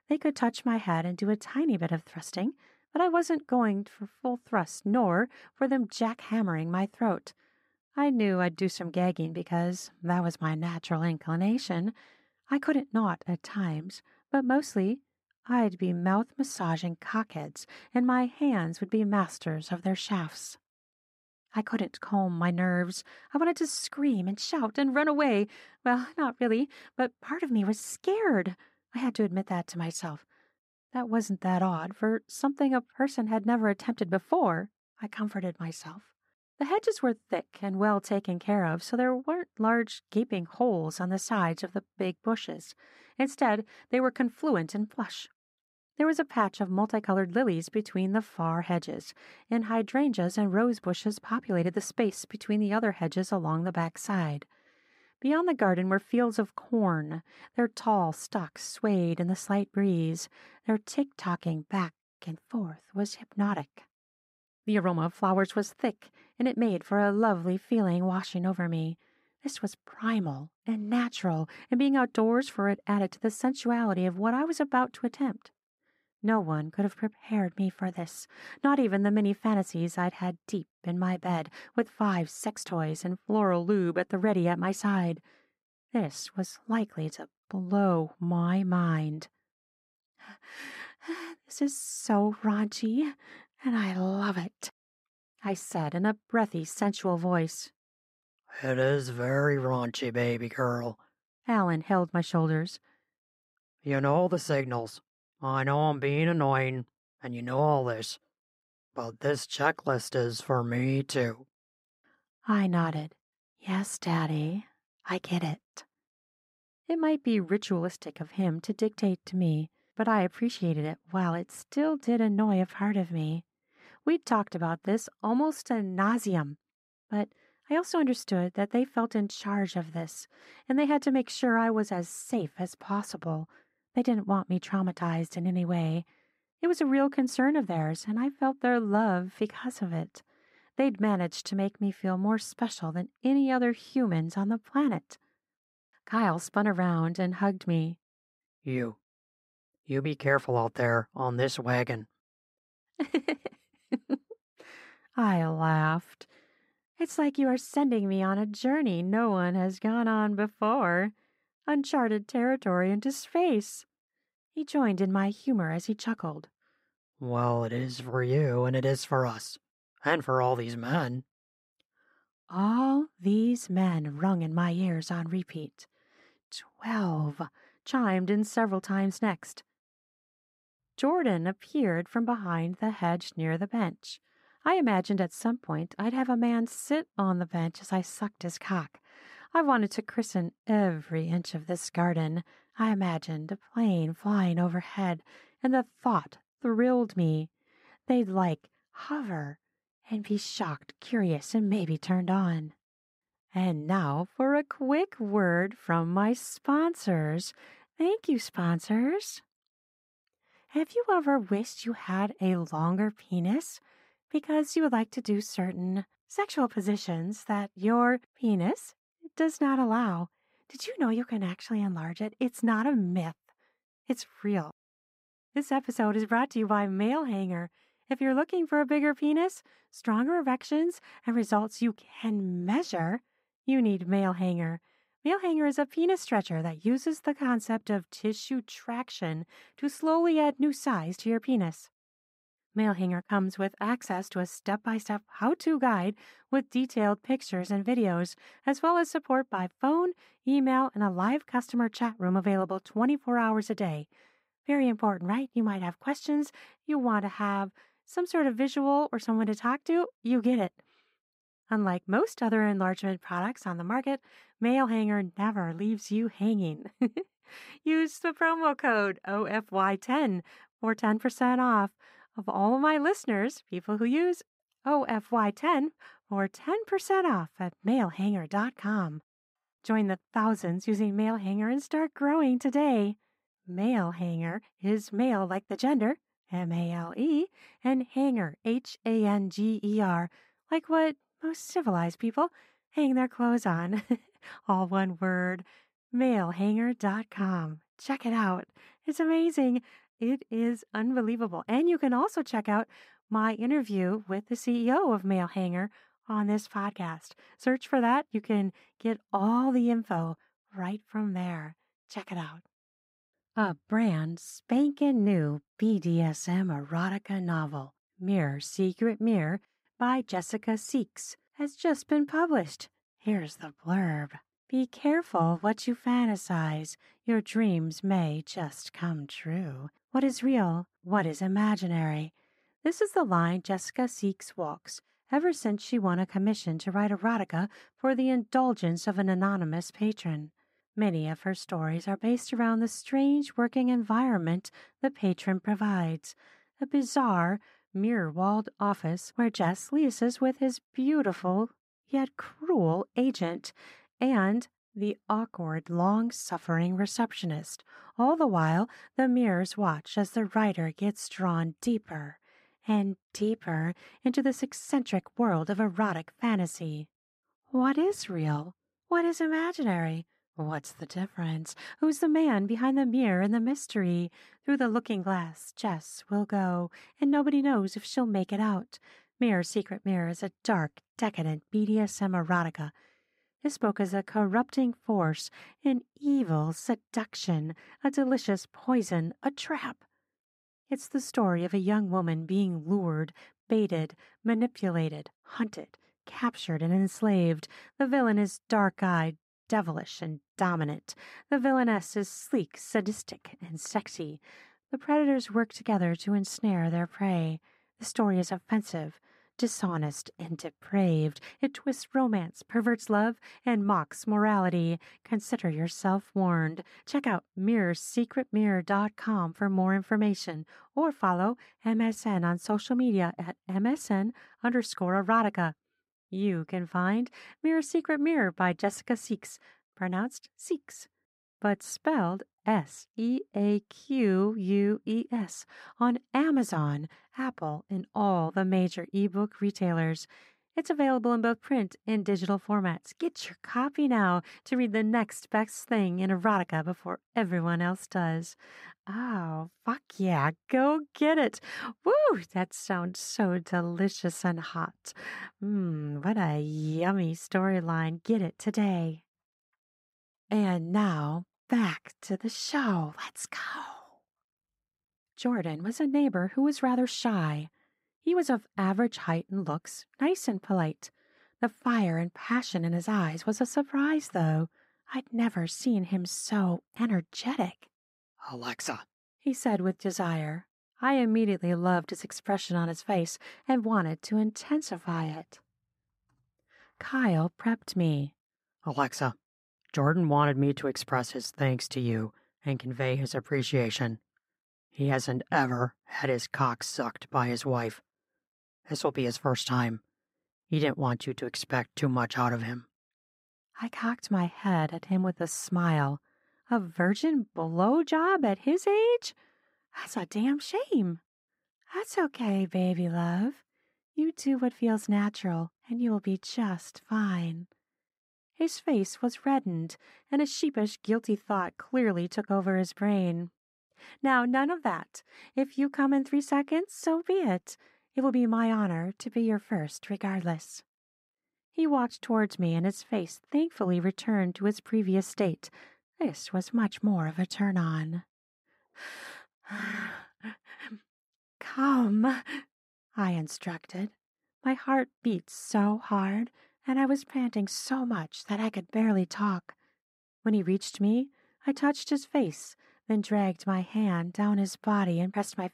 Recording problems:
muffled; slightly; fading above 2 kHz

